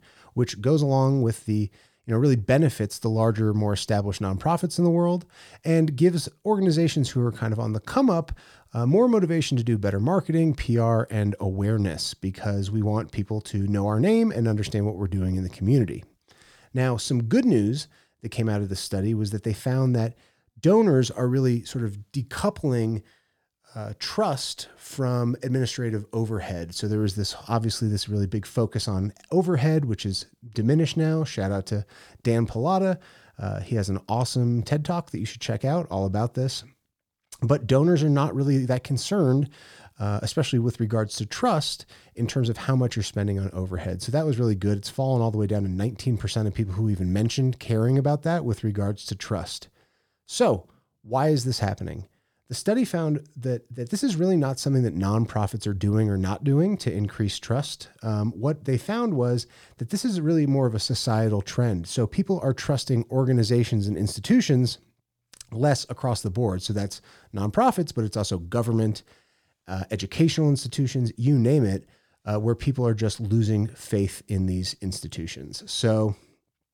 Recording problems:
none

